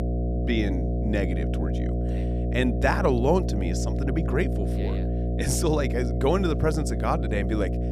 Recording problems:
electrical hum; loud; throughout; 60 Hz, 7 dB below the speech

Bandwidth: 15 kHz